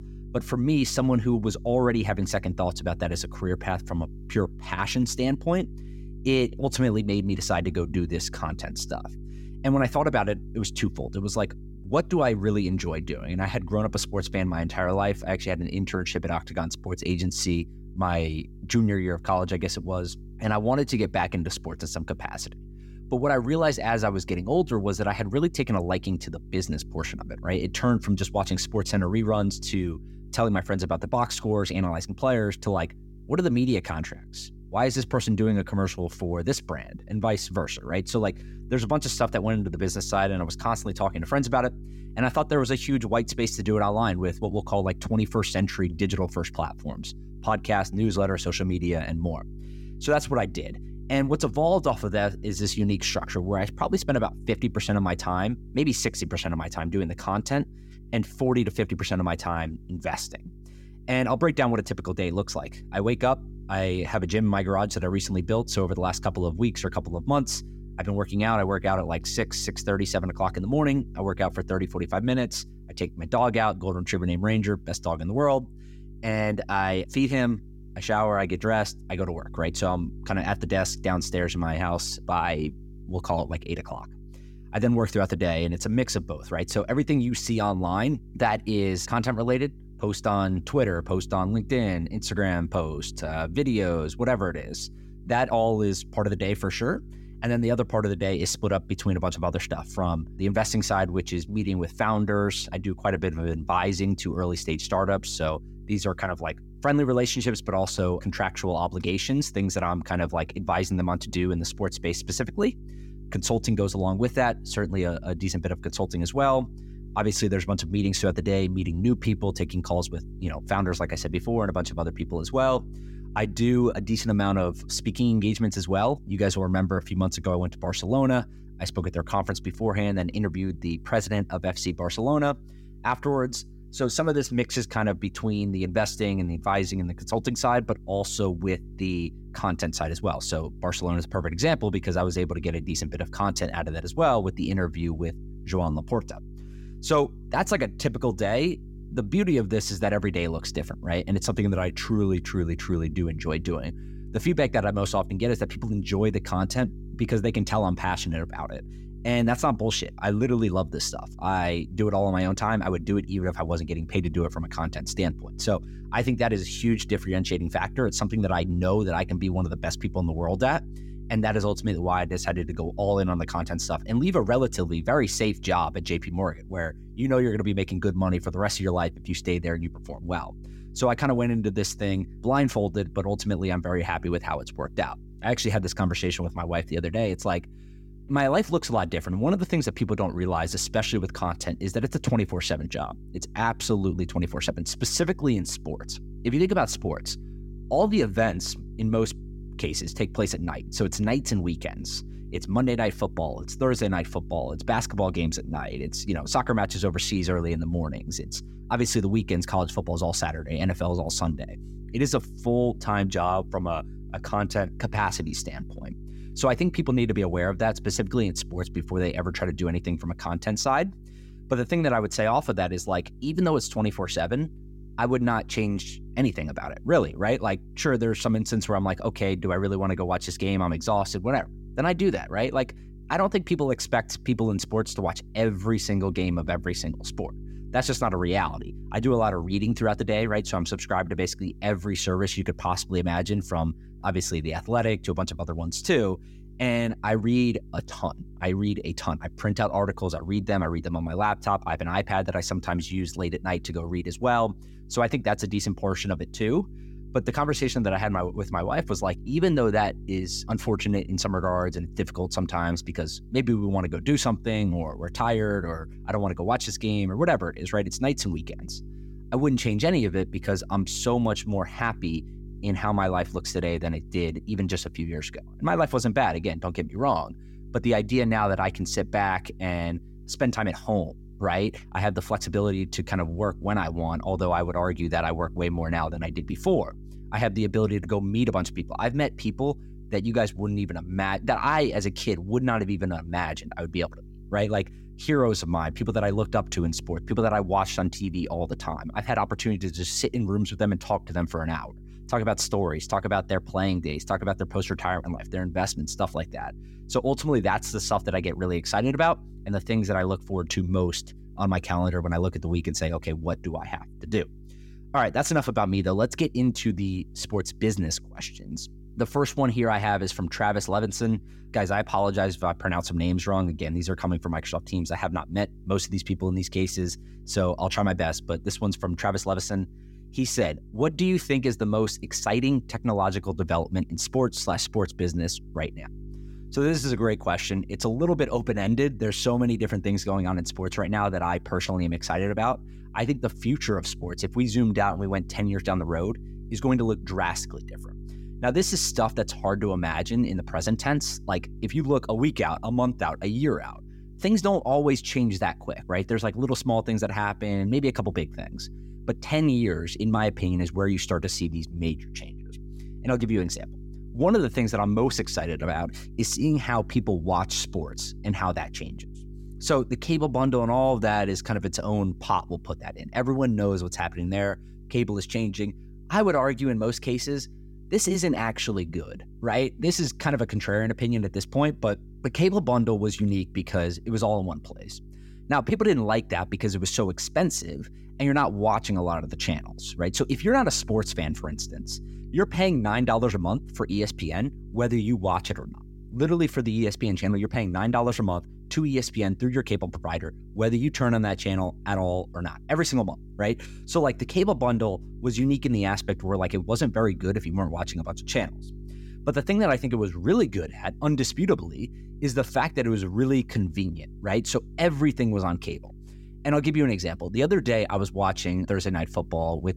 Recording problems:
electrical hum; faint; throughout; 50 Hz, 25 dB below the speech

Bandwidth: 16 kHz